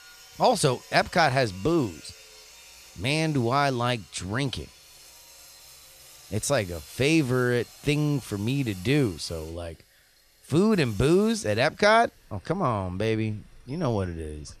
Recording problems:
machinery noise; faint; throughout; 20 dB below the speech

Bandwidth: 14.5 kHz